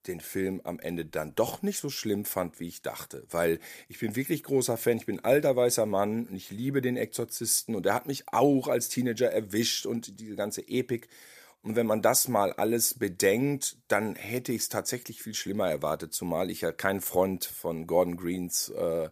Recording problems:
none

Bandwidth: 14.5 kHz